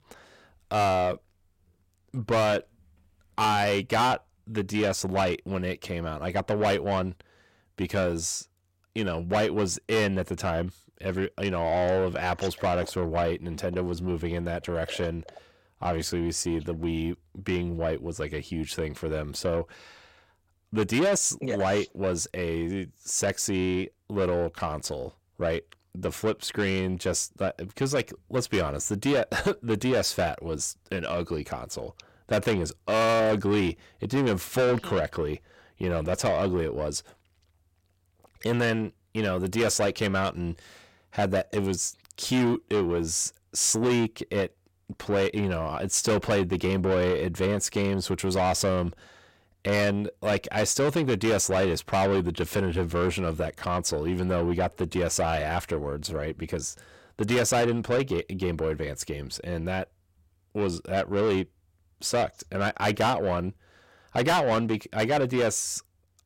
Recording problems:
distortion; heavy; 6 dB below the speech

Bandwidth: 16.5 kHz